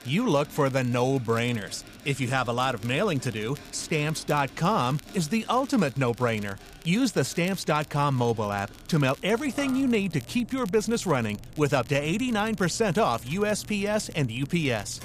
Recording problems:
machinery noise; noticeable; throughout; 20 dB below the speech
crackle, like an old record; faint; 25 dB below the speech

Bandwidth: 14.5 kHz